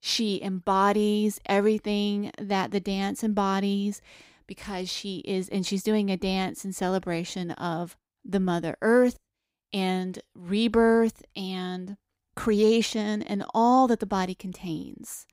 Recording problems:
none

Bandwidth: 15.5 kHz